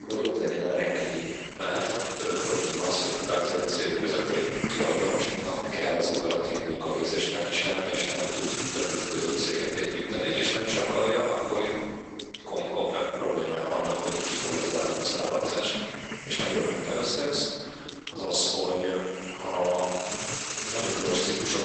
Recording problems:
room echo; strong; dies away in 1.6 s
off-mic speech; far
garbled, watery; badly; nothing above 8 kHz
thin; somewhat; fading below 400 Hz
hiss; loud; throughout; 7 dB below the speech
uneven, jittery; strongly; from 2 to 18 s

